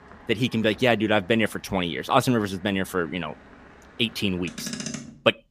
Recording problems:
traffic noise; noticeable; throughout; 15 dB below the speech

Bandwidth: 15 kHz